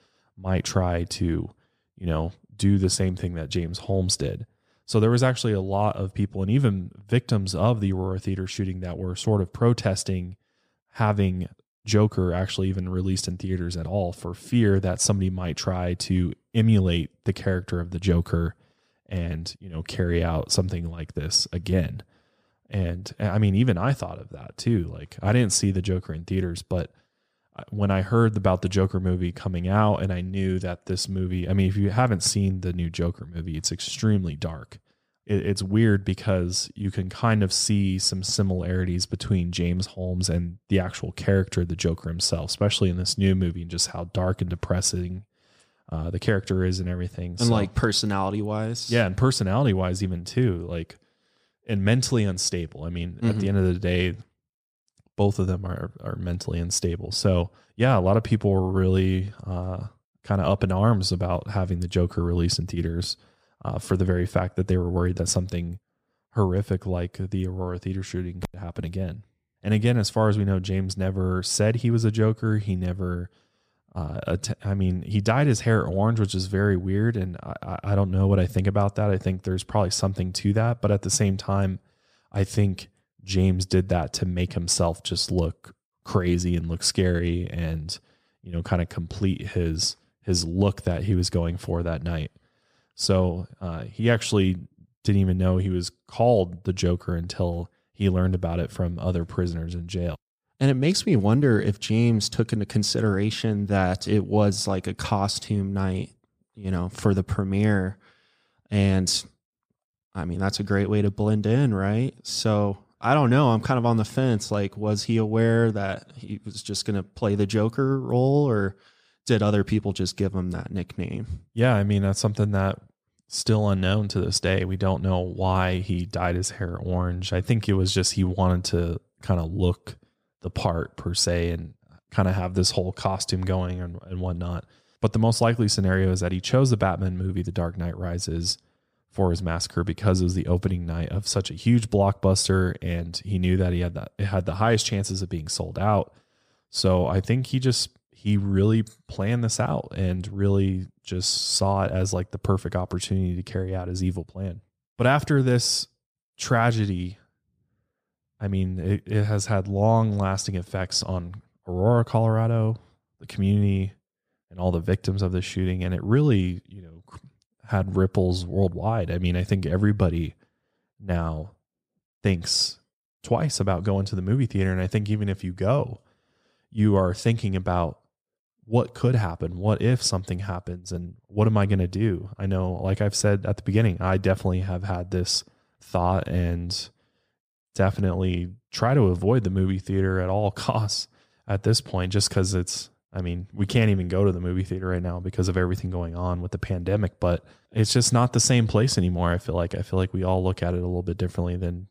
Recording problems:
none

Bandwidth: 14.5 kHz